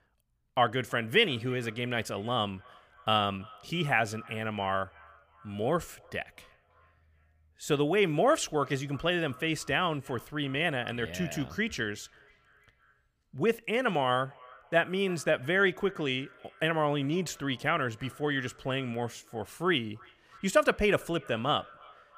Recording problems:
echo of what is said; faint; throughout; 330 ms later, 25 dB below the speech

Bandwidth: 15 kHz